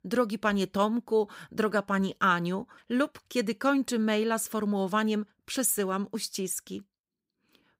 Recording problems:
none

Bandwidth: 15.5 kHz